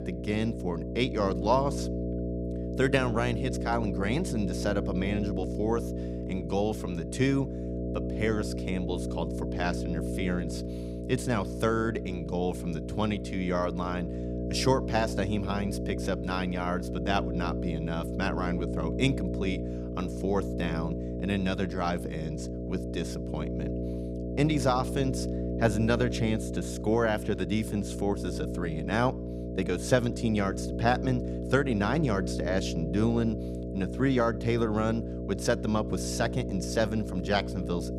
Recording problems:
electrical hum; loud; throughout; 60 Hz, 7 dB below the speech

